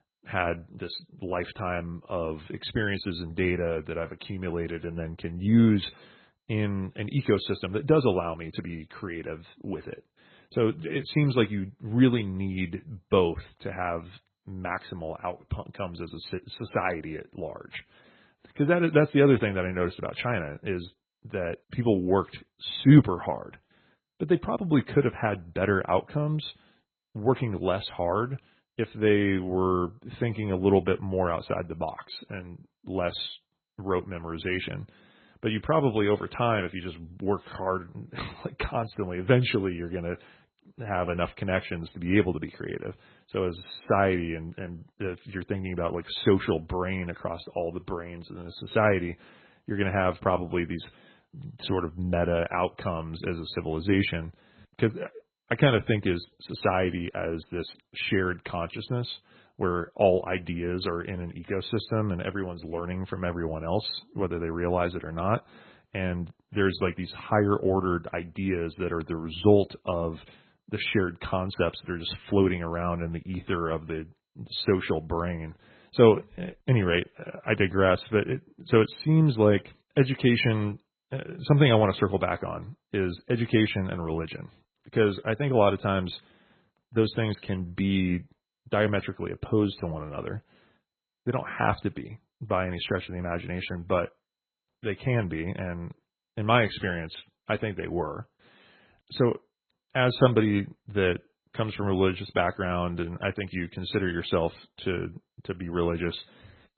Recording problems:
garbled, watery; badly; nothing above 4 kHz

